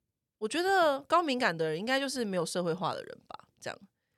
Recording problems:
none

